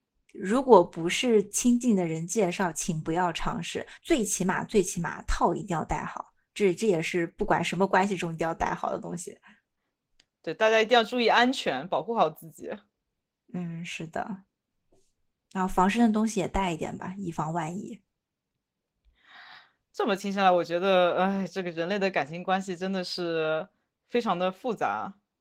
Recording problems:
garbled, watery; slightly; nothing above 16 kHz

